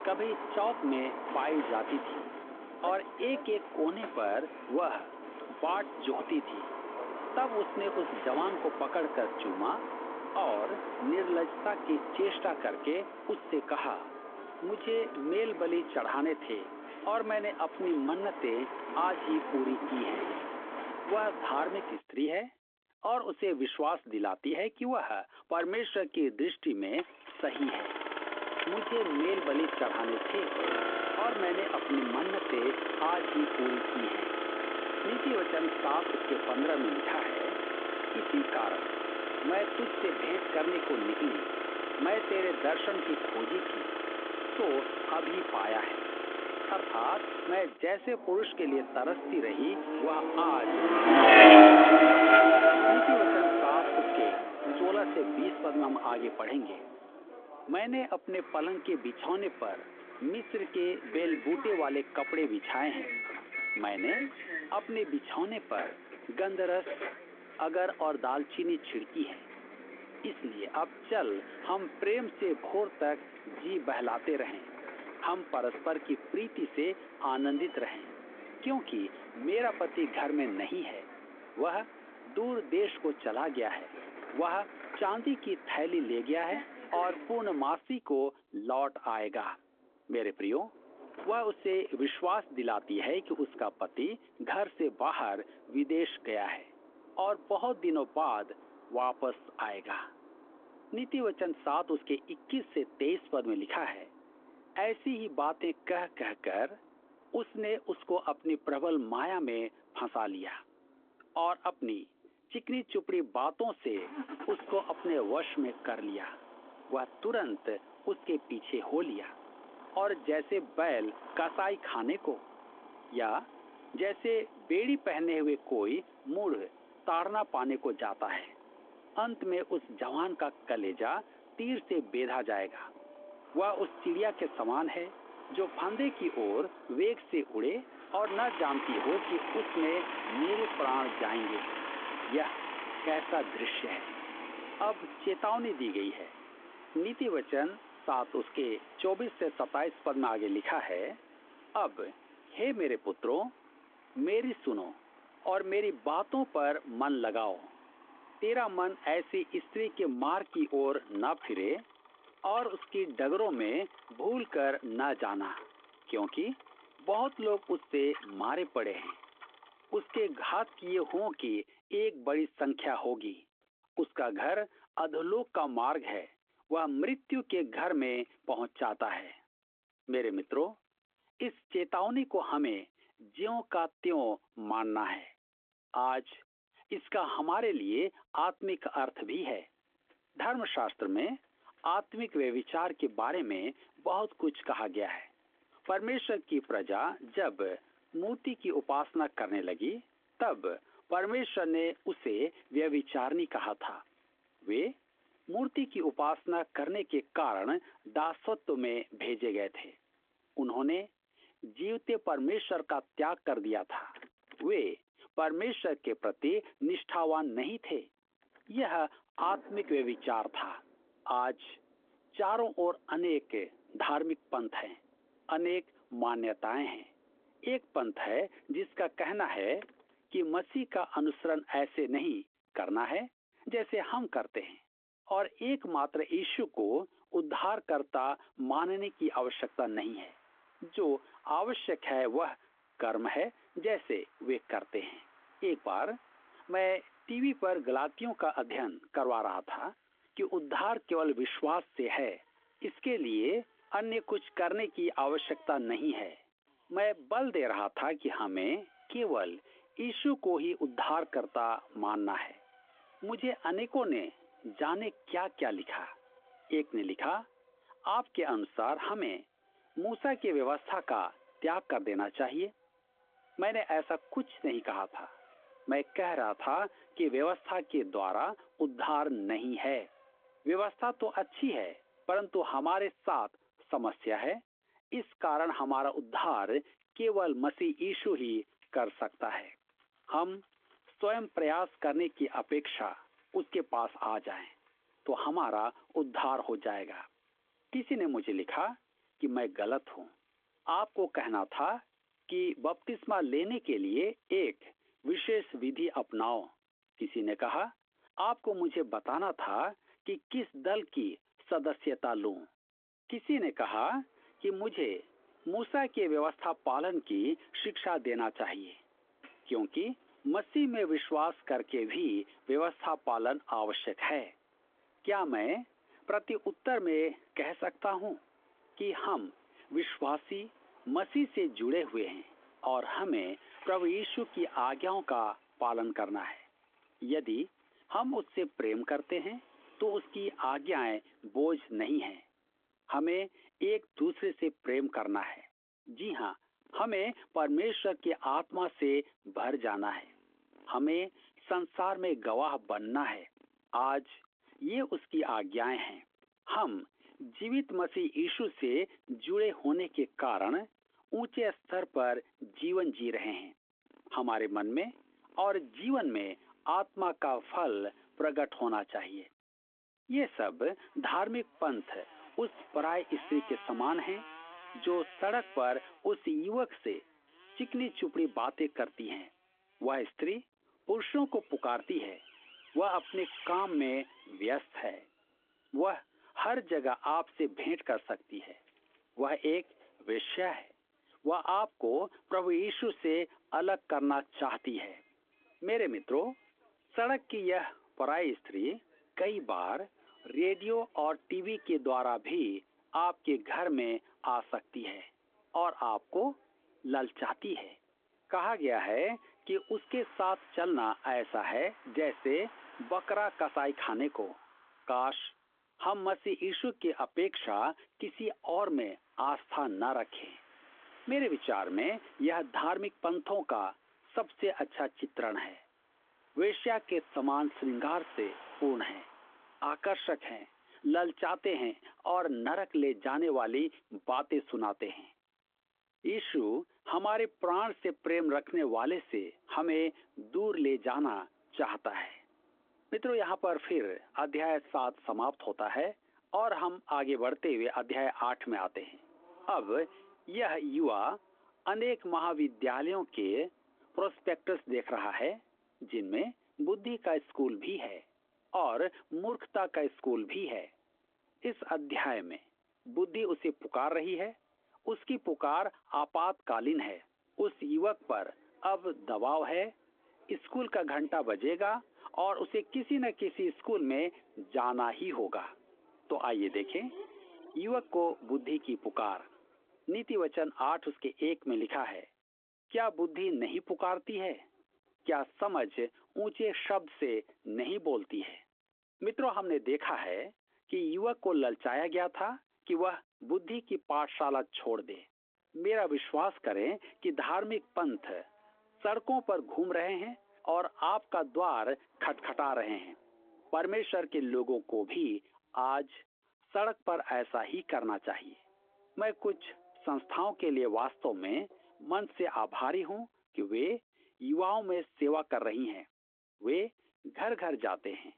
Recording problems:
phone-call audio; nothing above 3.5 kHz
traffic noise; very loud; throughout; 3 dB above the speech

